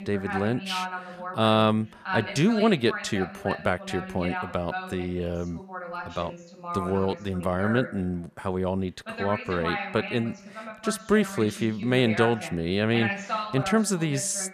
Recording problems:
voice in the background; loud; throughout; 8 dB below the speech

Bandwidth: 14 kHz